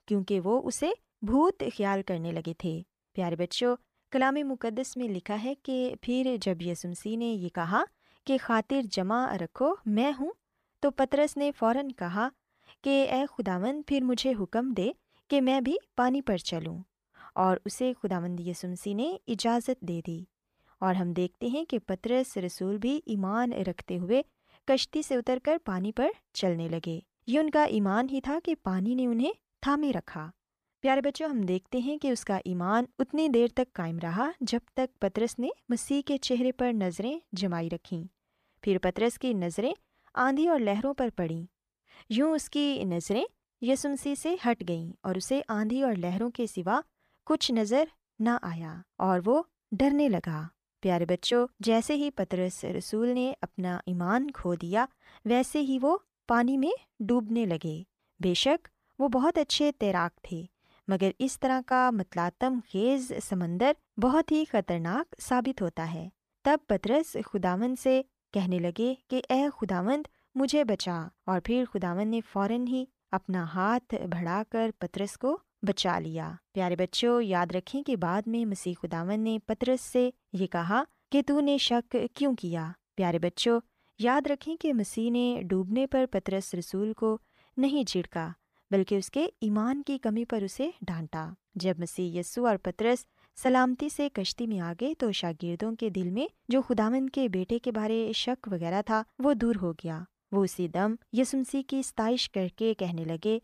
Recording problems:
none

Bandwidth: 14.5 kHz